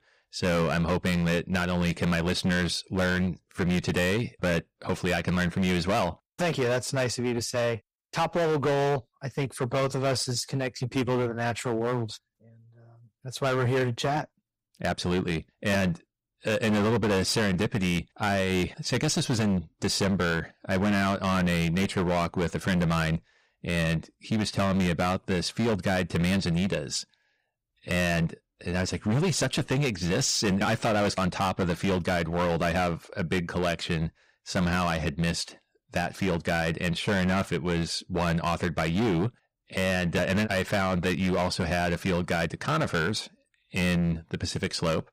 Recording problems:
distortion; heavy; 16% of the sound clipped

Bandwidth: 15.5 kHz